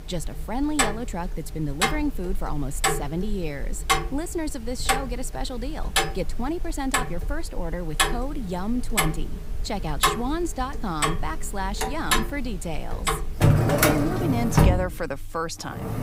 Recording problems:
household noises; very loud; throughout; 5 dB above the speech

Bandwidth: 15.5 kHz